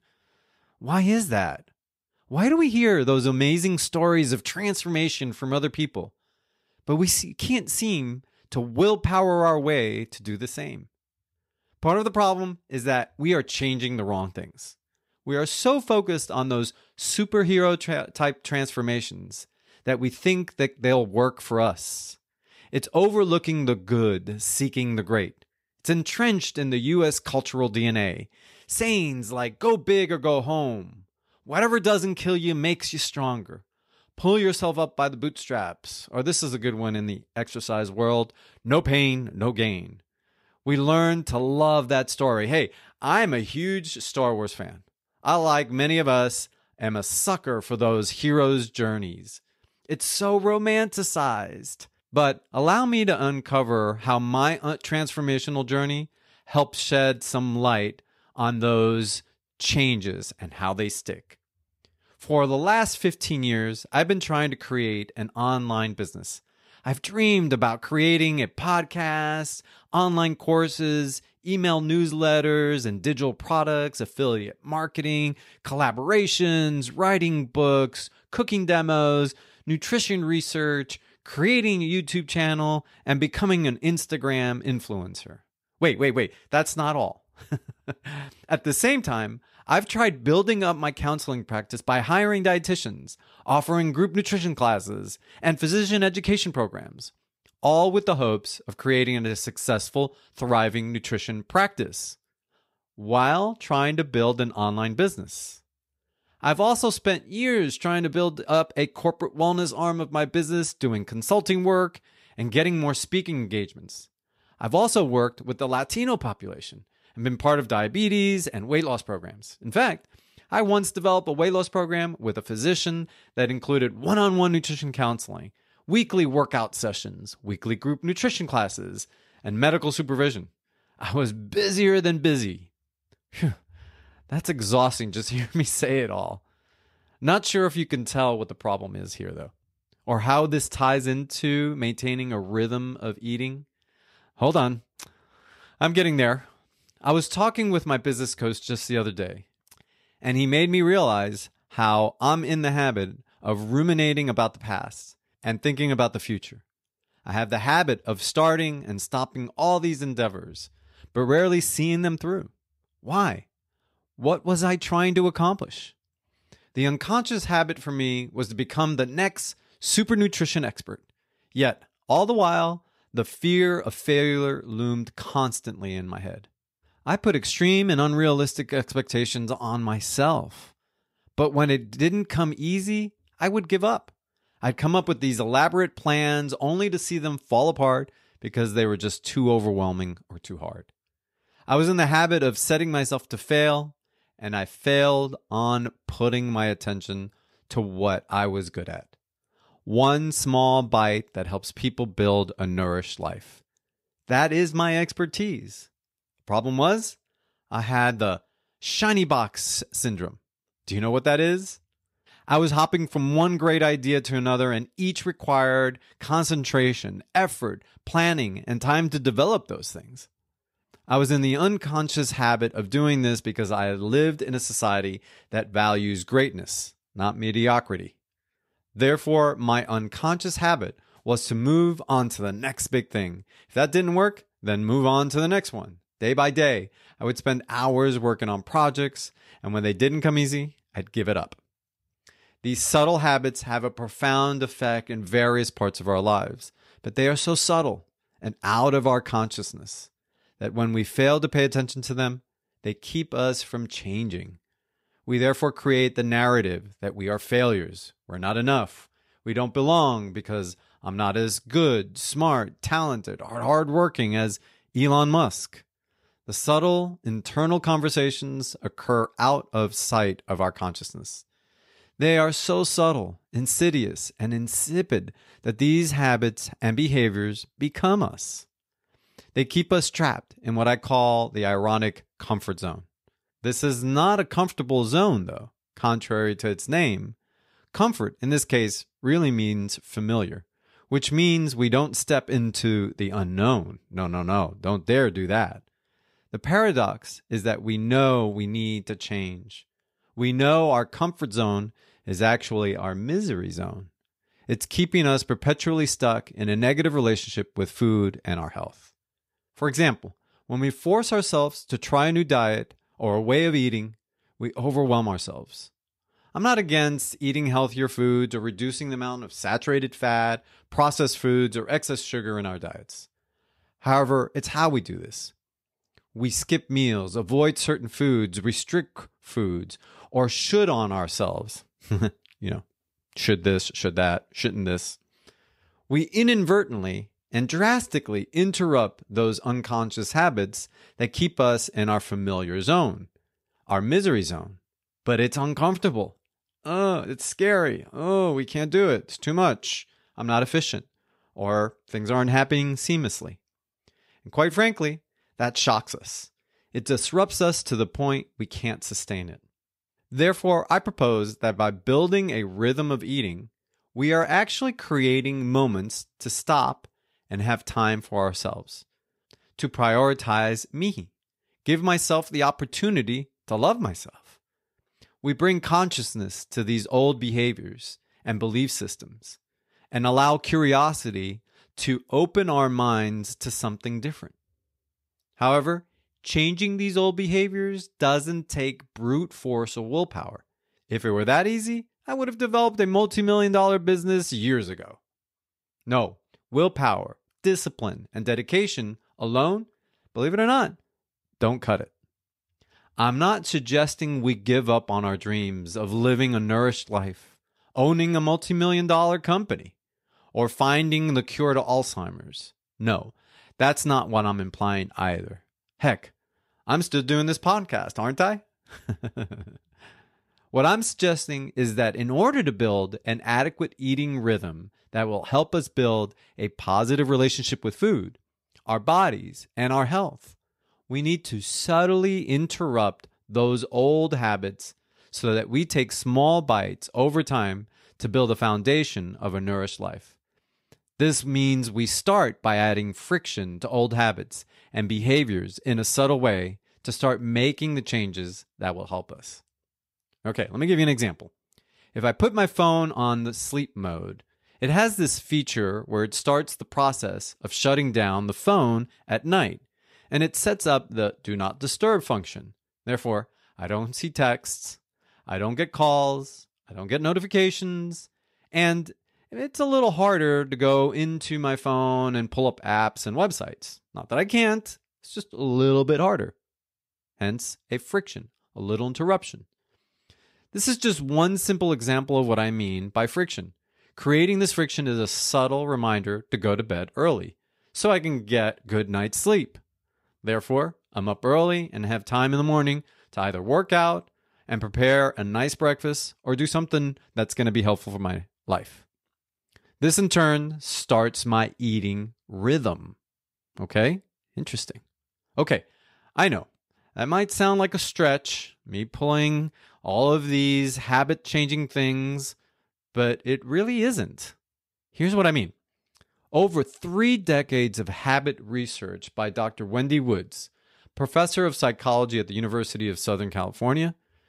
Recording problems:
none

